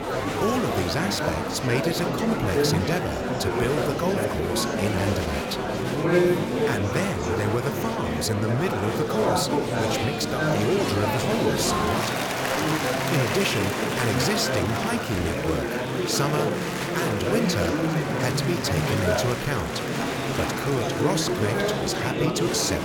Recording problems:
murmuring crowd; very loud; throughout; 2 dB above the speech

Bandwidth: 18 kHz